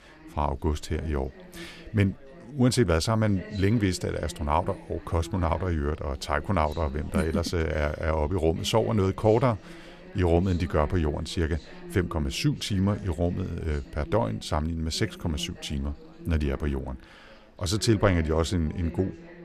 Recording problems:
background chatter; noticeable; throughout; 3 voices, 20 dB below the speech

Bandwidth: 14 kHz